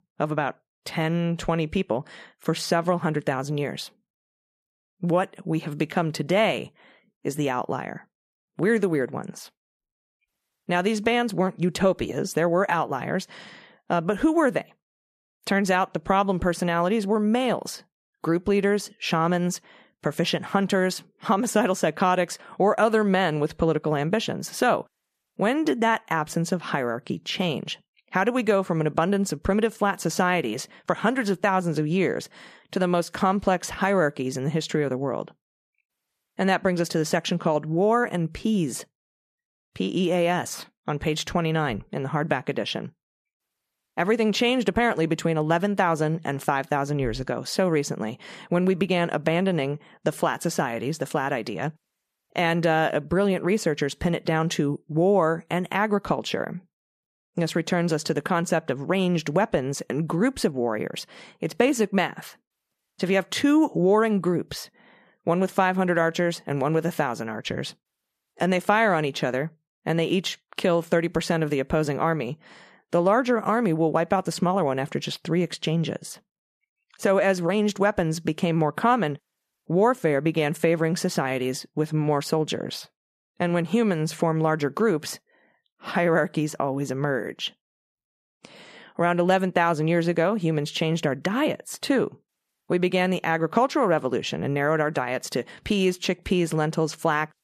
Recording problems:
none

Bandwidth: 14.5 kHz